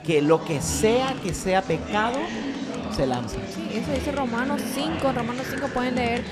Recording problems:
murmuring crowd; loud; throughout; 5 dB below the speech

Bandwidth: 14 kHz